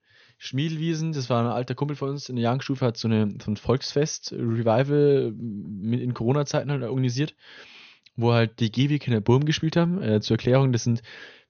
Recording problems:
high frequencies cut off; noticeable; nothing above 6.5 kHz

